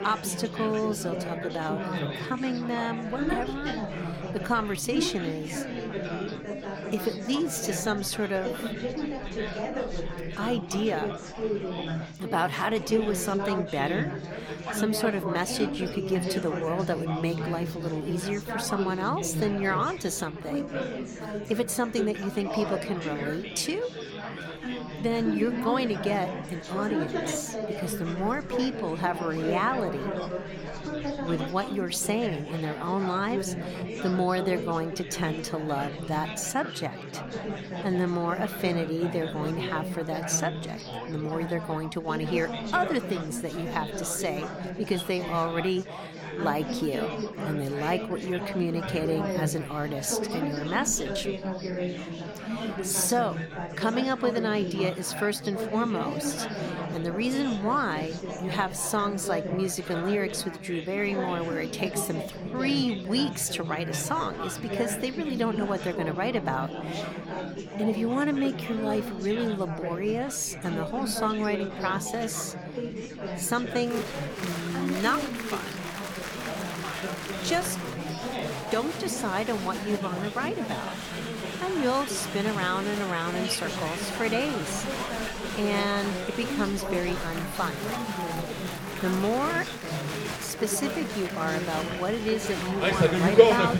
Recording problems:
chatter from many people; loud; throughout; 3 dB below the speech

